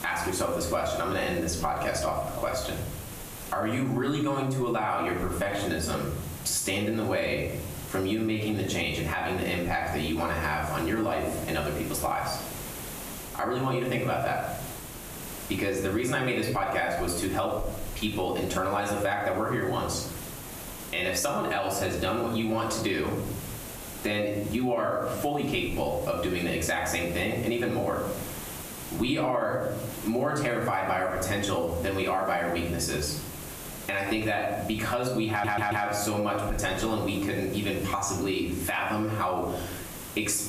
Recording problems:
off-mic speech; far
squashed, flat; heavily
room echo; slight; dies away in 0.6 s
hiss; noticeable; throughout; 15 dB below the speech
audio stuttering; at 35 s

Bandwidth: 14.5 kHz